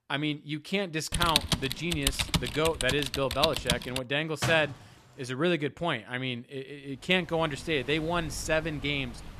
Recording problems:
animal sounds; noticeable; from 7.5 s on; 15 dB below the speech
keyboard typing; loud; from 1 to 4 s; peak 4 dB above the speech
door banging; noticeable; at 4.5 s; peak 3 dB below the speech

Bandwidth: 14 kHz